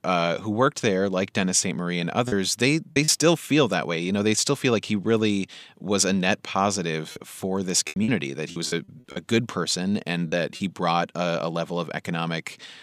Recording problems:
choppy; very; at 2.5 s and from 7 to 11 s; 9% of the speech affected

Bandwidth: 15 kHz